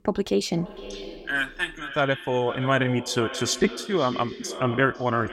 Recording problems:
echo of what is said; noticeable; throughout; 500 ms later, 10 dB below the speech

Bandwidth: 16 kHz